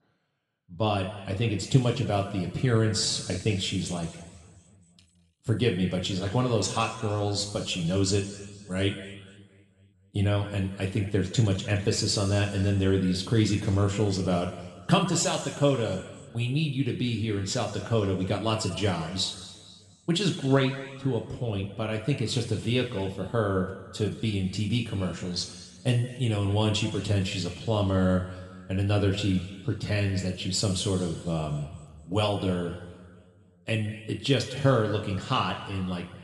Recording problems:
room echo; noticeable; dies away in 1.7 s
off-mic speech; somewhat distant

